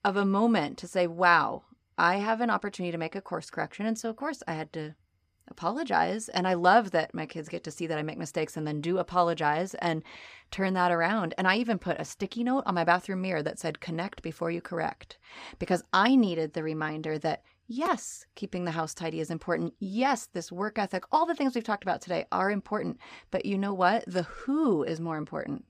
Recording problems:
none

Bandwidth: 15 kHz